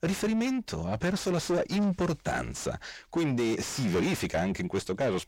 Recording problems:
distortion; heavy; 5 dB below the speech

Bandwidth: 16 kHz